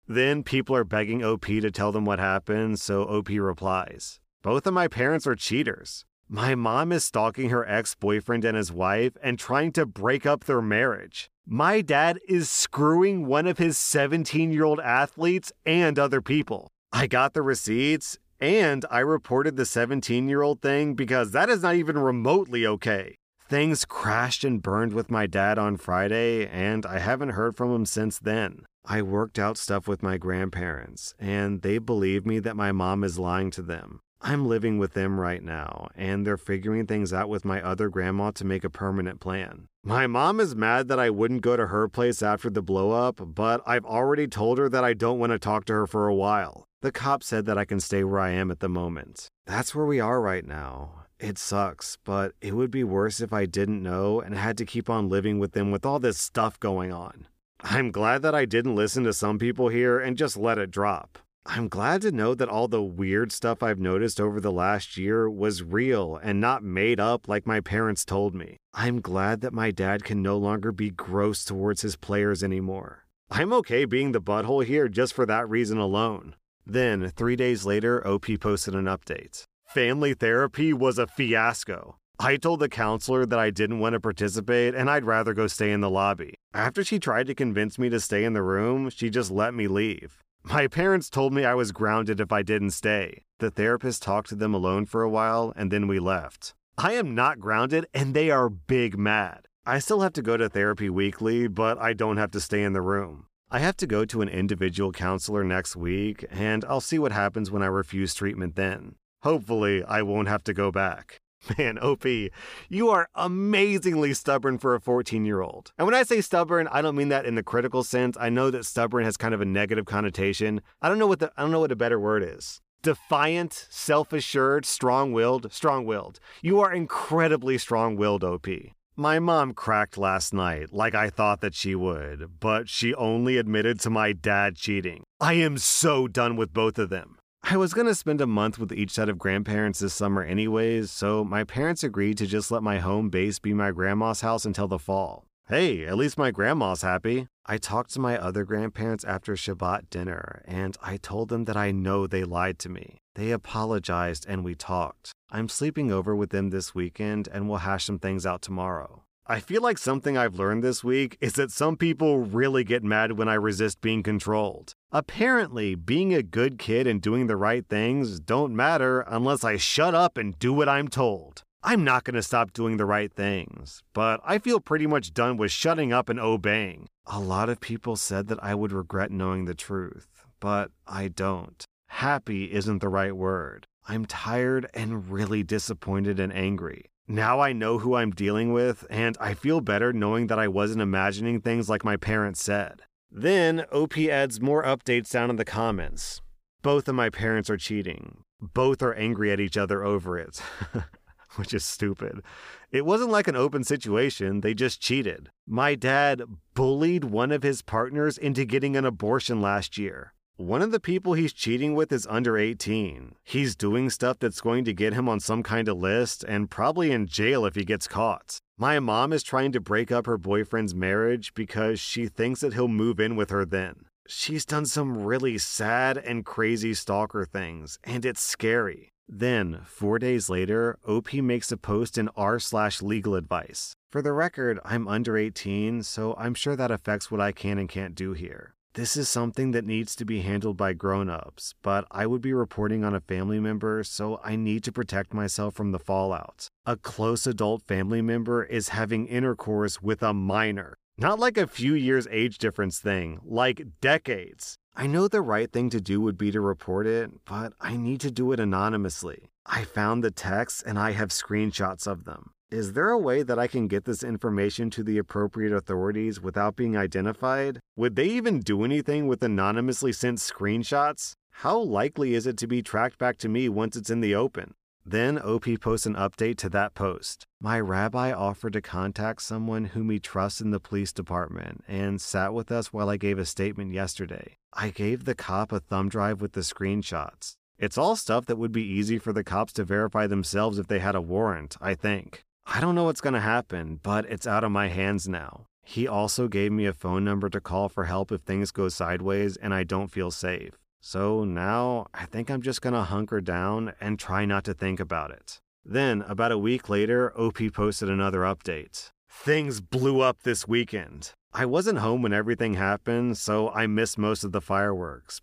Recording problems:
none

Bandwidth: 15 kHz